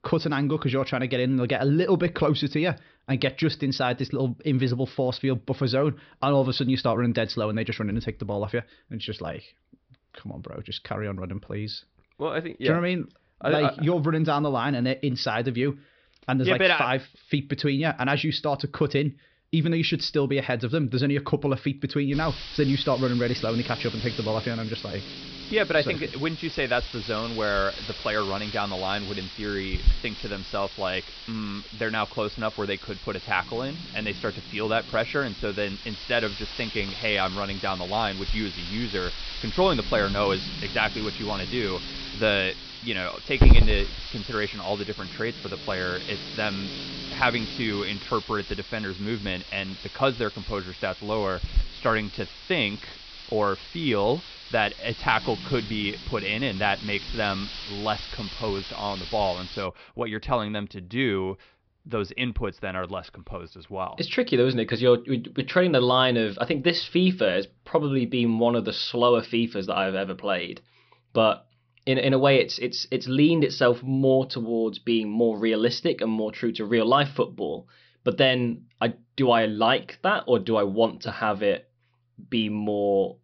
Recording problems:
high frequencies cut off; noticeable; nothing above 5.5 kHz
hiss; loud; from 22 s to 1:00; 8 dB below the speech

